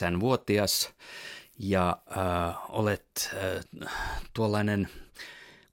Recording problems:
abrupt cut into speech; at the start

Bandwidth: 16.5 kHz